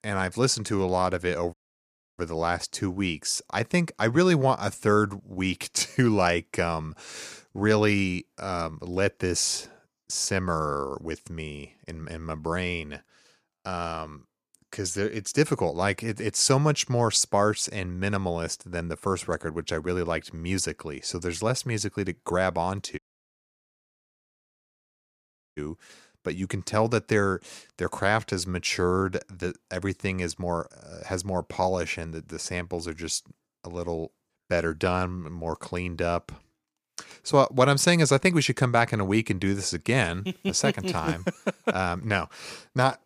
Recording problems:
audio cutting out; at 1.5 s for 0.5 s and at 23 s for 2.5 s

